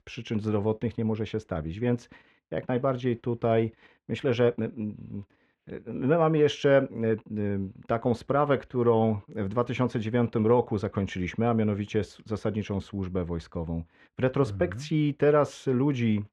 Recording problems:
muffled; very; fading above 2.5 kHz

